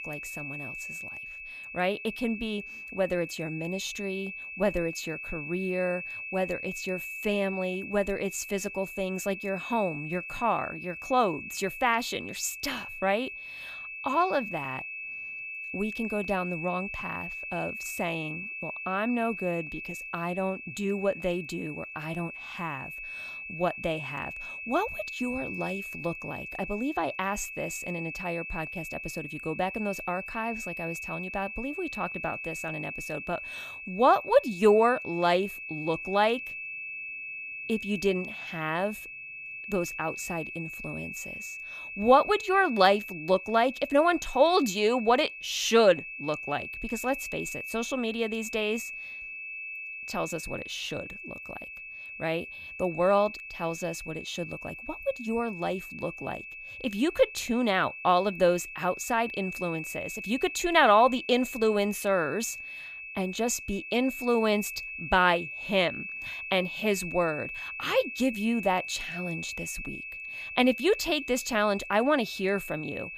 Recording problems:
high-pitched whine; loud; throughout; 2.5 kHz, 8 dB below the speech

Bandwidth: 14.5 kHz